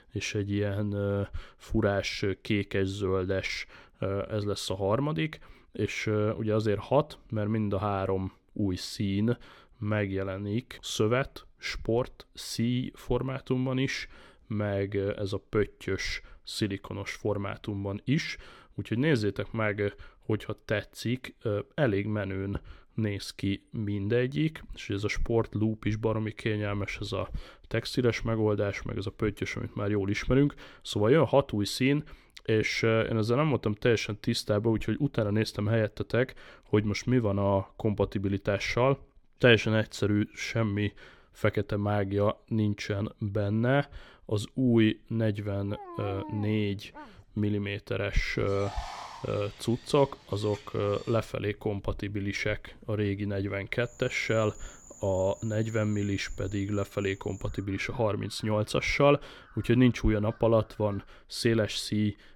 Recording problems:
animal sounds; noticeable; from 46 s on; 20 dB below the speech

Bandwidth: 17.5 kHz